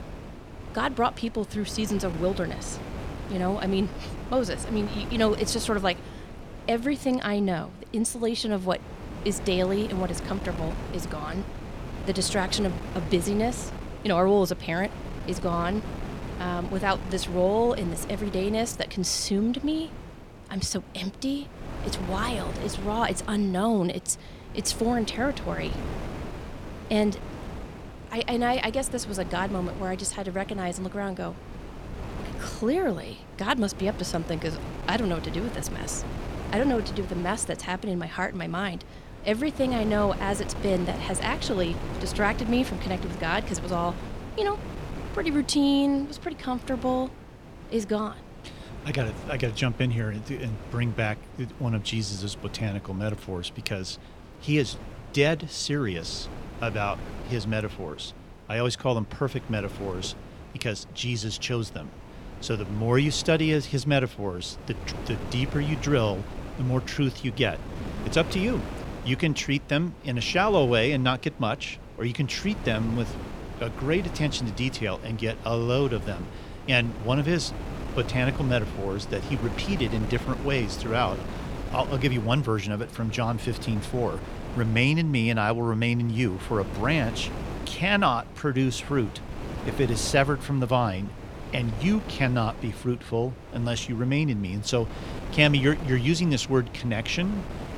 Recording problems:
wind noise on the microphone; occasional gusts; 15 dB below the speech

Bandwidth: 17.5 kHz